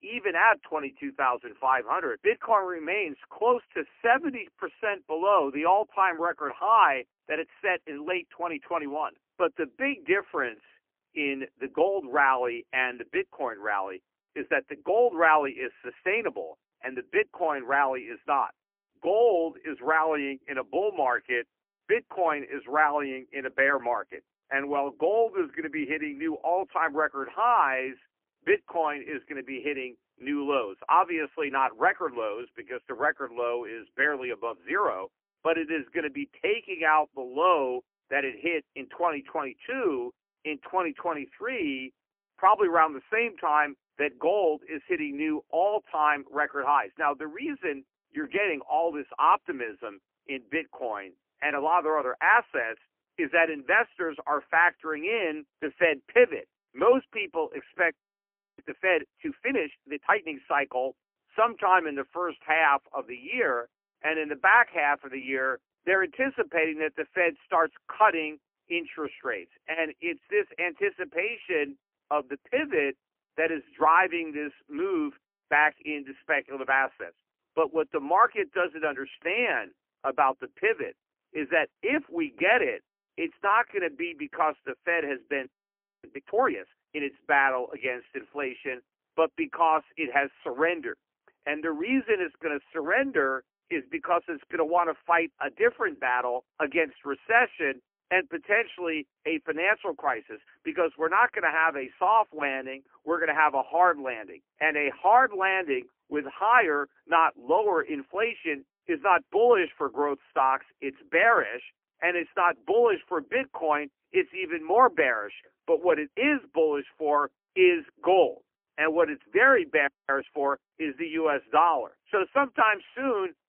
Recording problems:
phone-call audio; poor line; nothing above 3 kHz
audio freezing; at 58 s for 0.5 s, at 1:25 for 0.5 s and at 2:00

